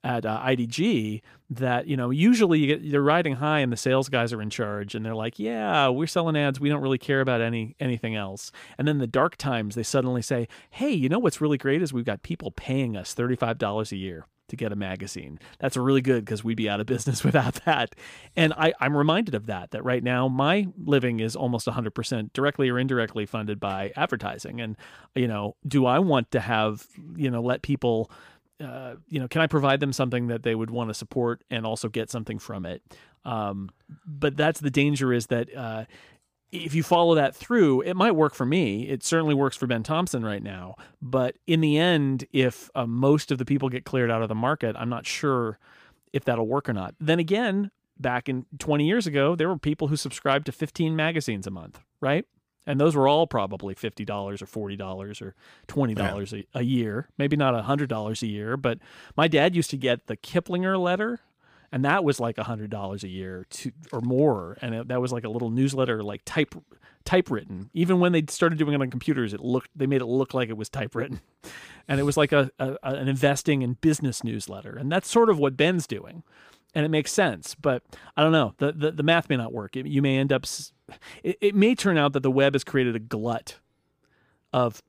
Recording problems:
none

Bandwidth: 15 kHz